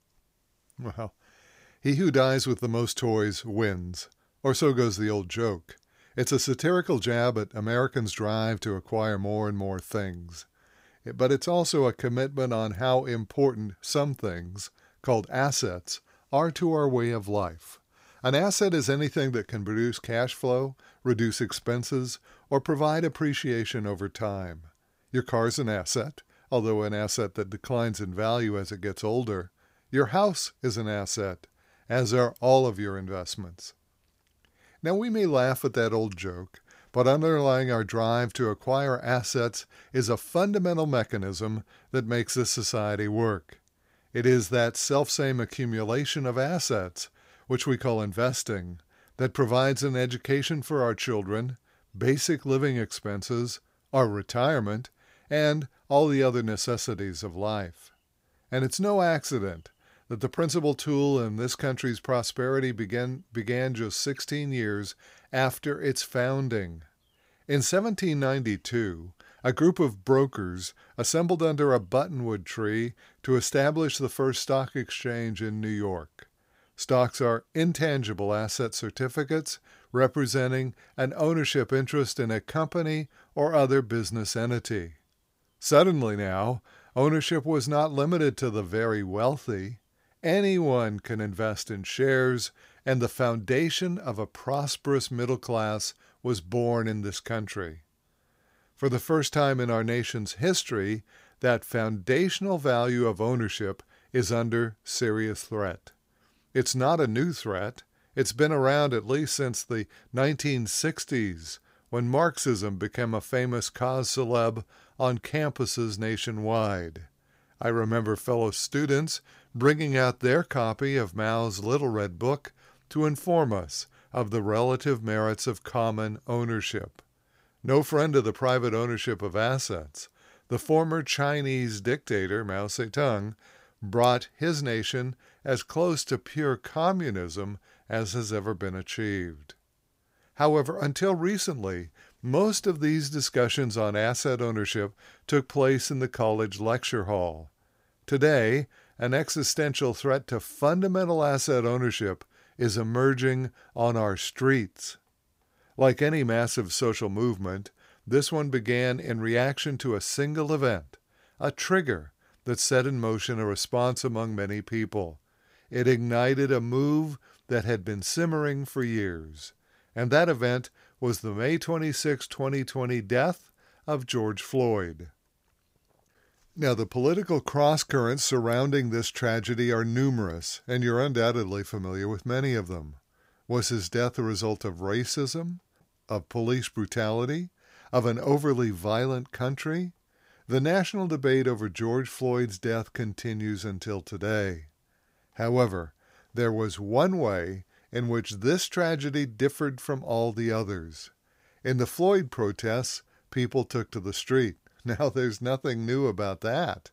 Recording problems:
none

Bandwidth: 15.5 kHz